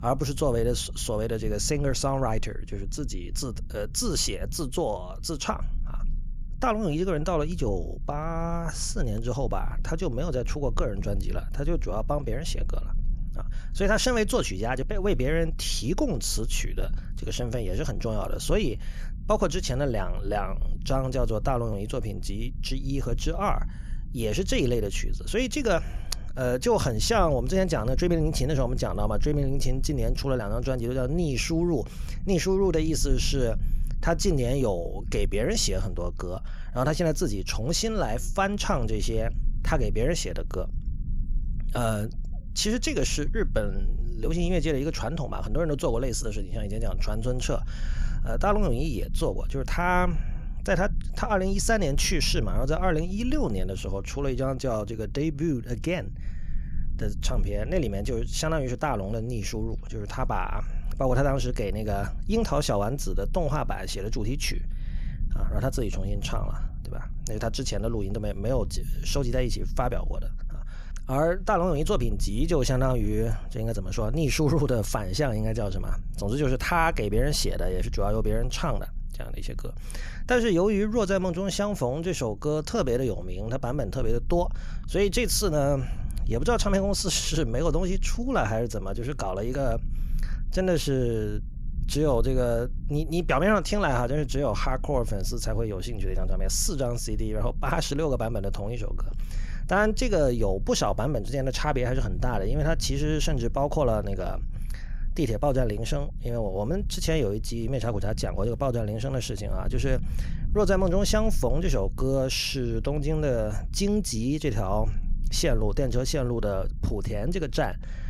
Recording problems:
low rumble; faint; throughout; 25 dB below the speech

